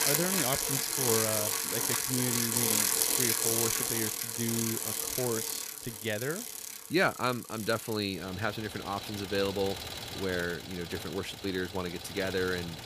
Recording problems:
traffic noise; very loud; throughout; 4 dB above the speech

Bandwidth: 15 kHz